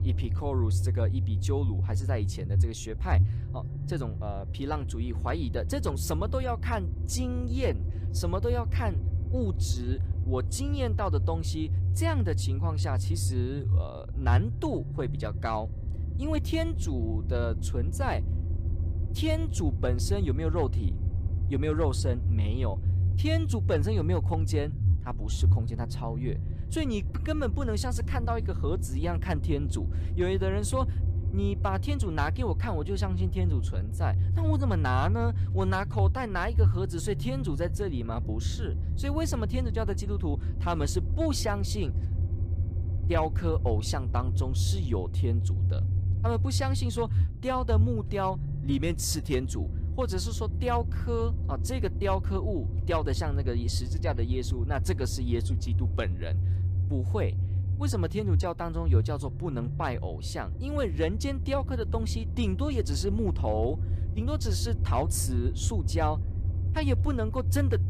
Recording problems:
low rumble; noticeable; throughout; 10 dB below the speech

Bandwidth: 15 kHz